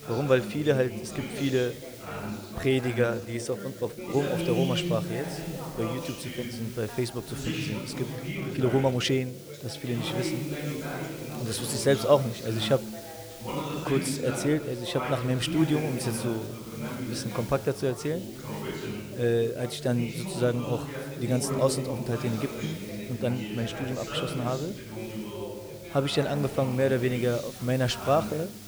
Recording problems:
background chatter; loud; throughout; 3 voices, 7 dB below the speech
hiss; noticeable; throughout; 20 dB below the speech
uneven, jittery; strongly; from 2.5 to 14 s

